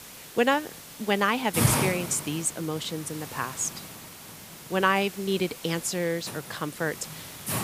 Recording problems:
hiss; loud; throughout; 6 dB below the speech

